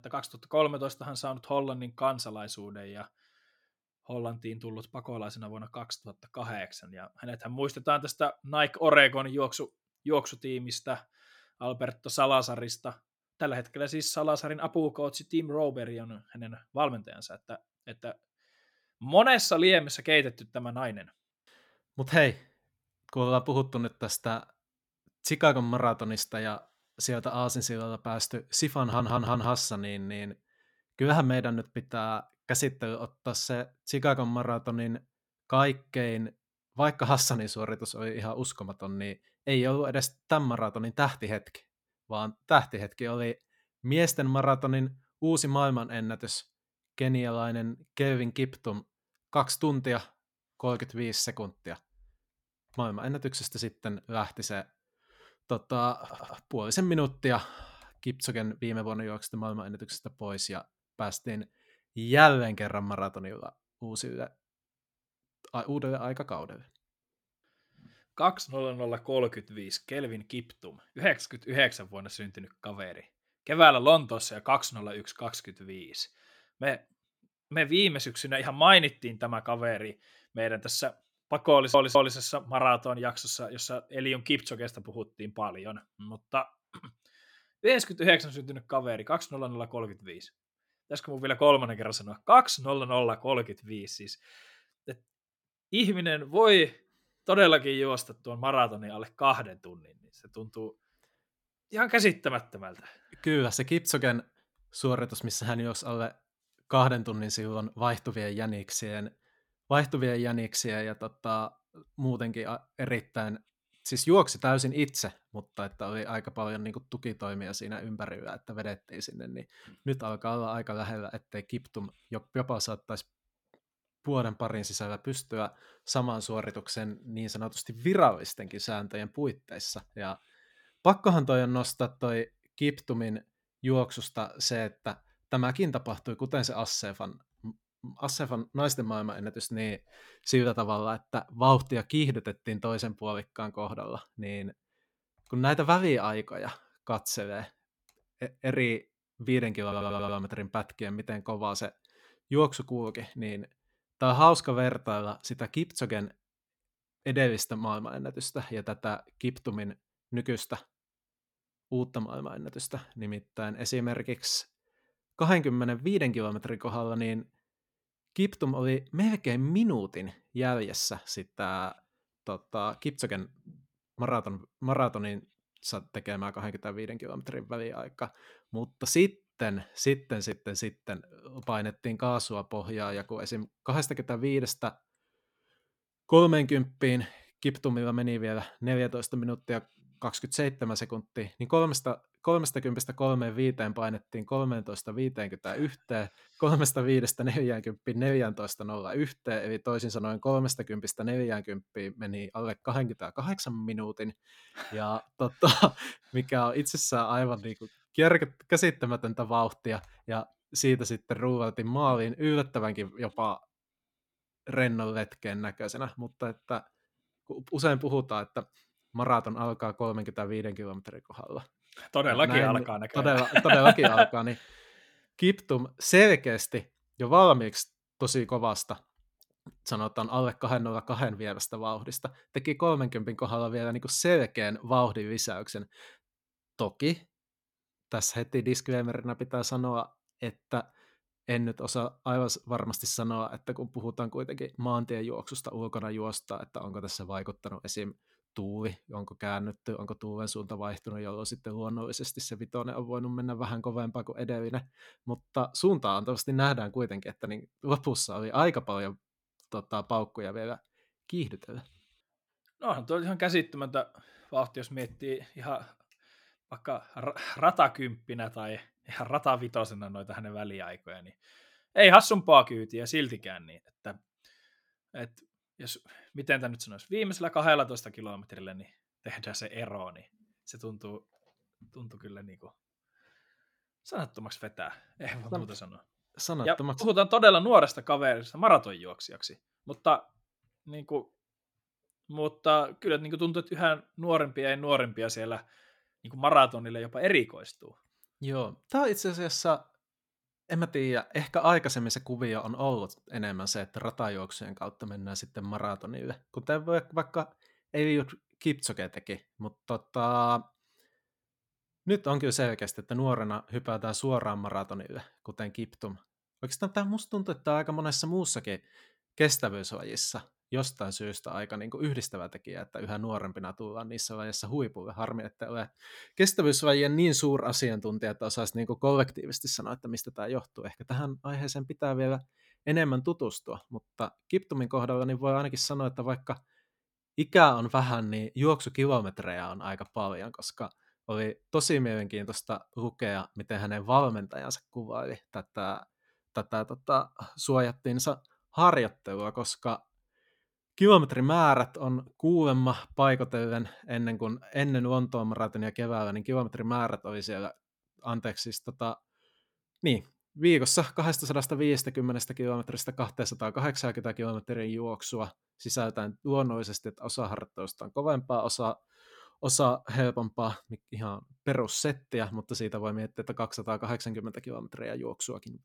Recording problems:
audio stuttering; 4 times, first at 29 s

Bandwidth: 17 kHz